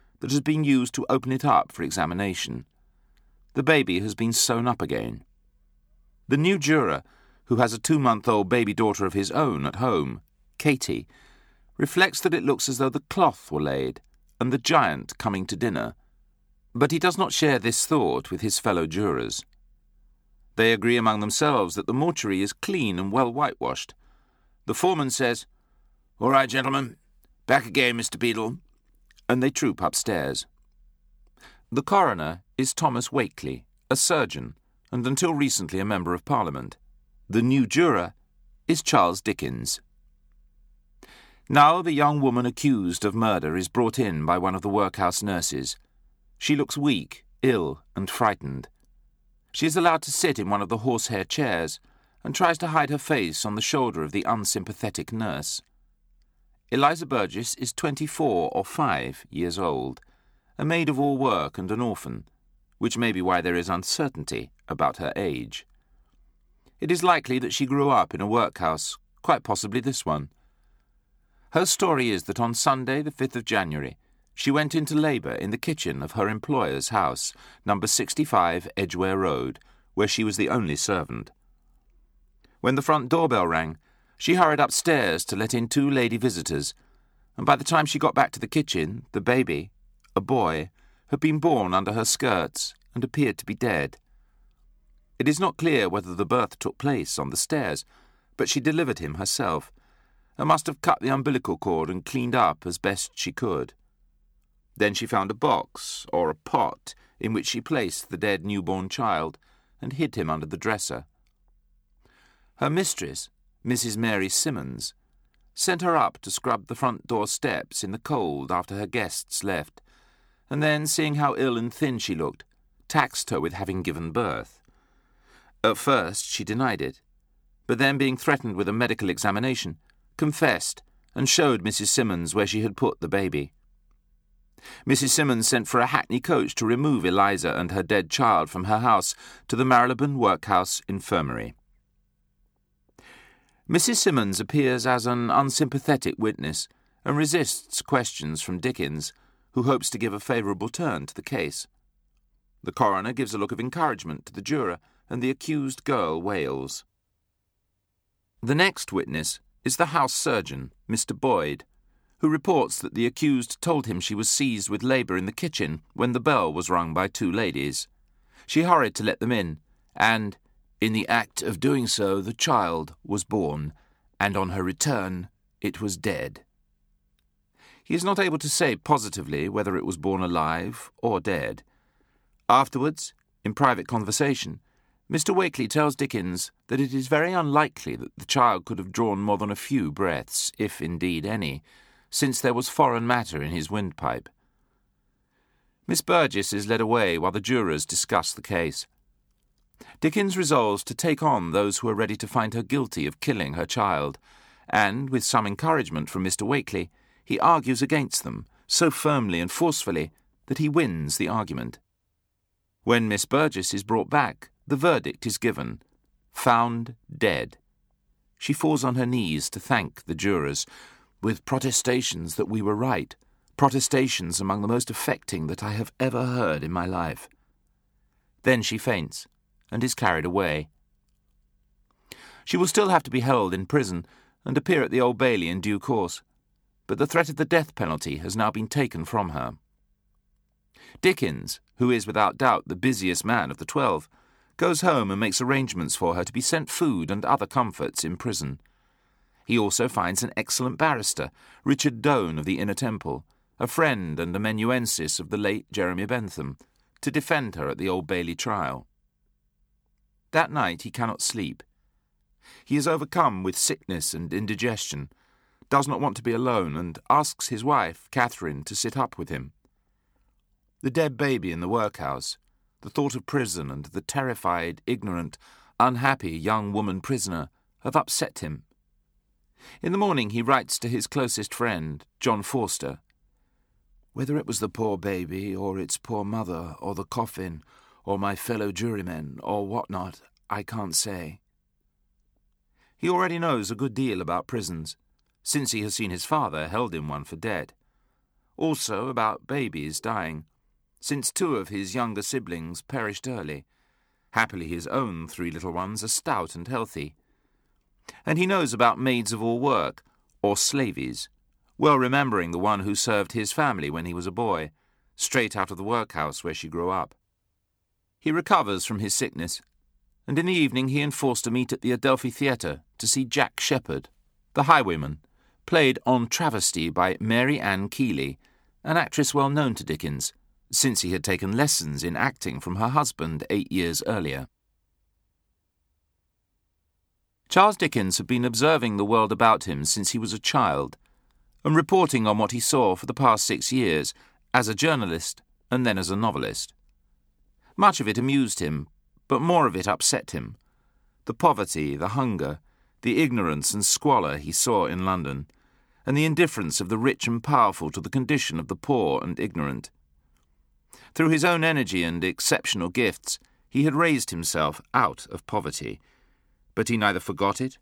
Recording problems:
none

